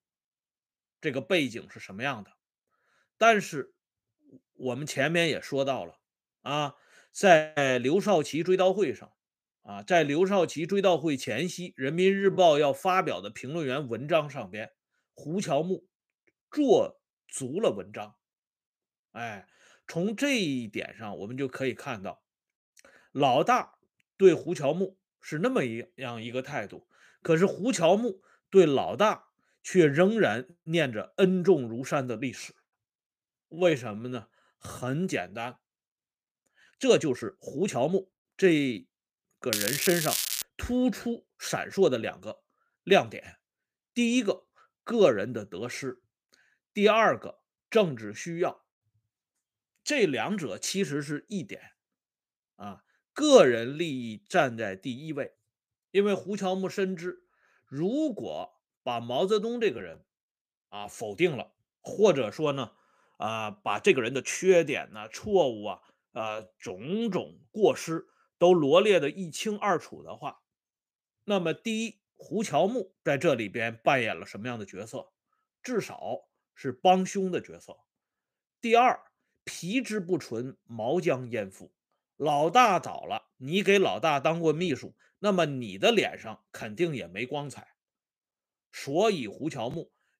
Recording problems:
crackling; loud; at 40 s; 2 dB below the speech
uneven, jittery; strongly; from 12 s to 1:26

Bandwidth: 15 kHz